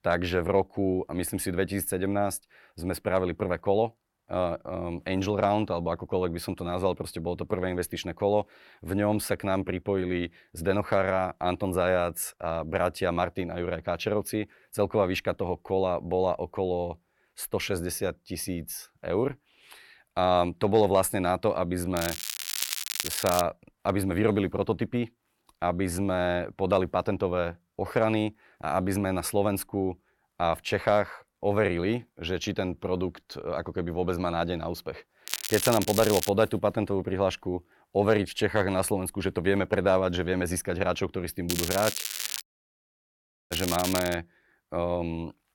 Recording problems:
crackling; loud; from 22 to 23 s, from 35 to 36 s and from 41 to 44 s; 3 dB below the speech
audio cutting out; at 42 s for 1 s

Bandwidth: 17.5 kHz